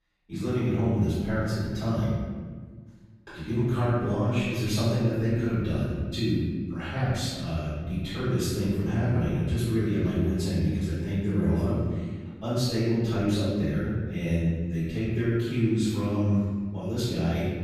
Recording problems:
room echo; strong; dies away in 1.5 s
off-mic speech; far

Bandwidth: 14.5 kHz